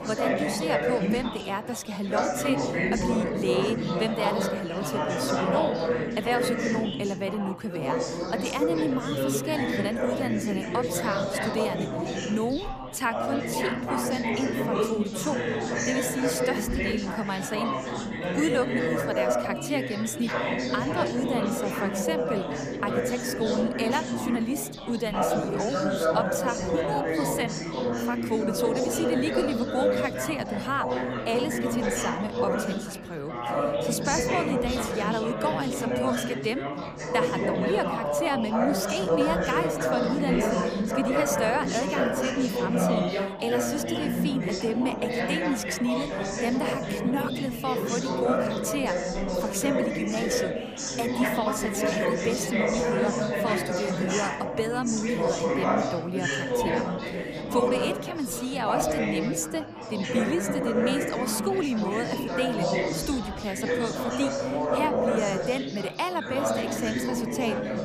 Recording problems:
chatter from many people; very loud; throughout; 2 dB above the speech

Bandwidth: 15 kHz